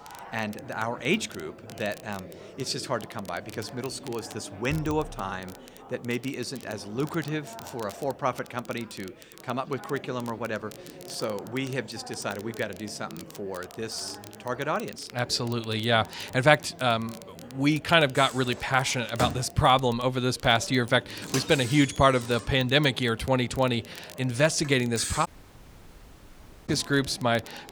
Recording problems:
household noises; loud; throughout; 10 dB below the speech
chatter from many people; noticeable; throughout; 20 dB below the speech
crackle, like an old record; faint; 20 dB below the speech
audio cutting out; at 25 s for 1.5 s

